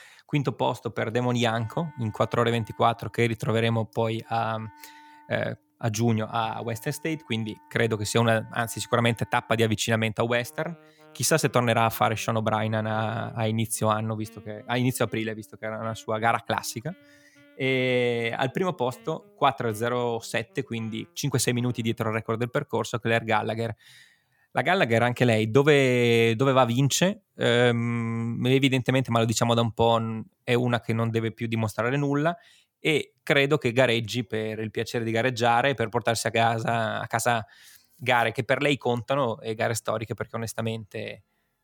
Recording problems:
background music; faint; throughout; 30 dB below the speech

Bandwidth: 18.5 kHz